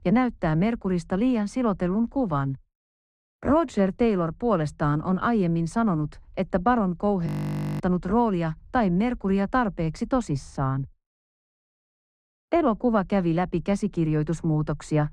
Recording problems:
muffled; very; fading above 2 kHz
audio freezing; at 7.5 s for 0.5 s

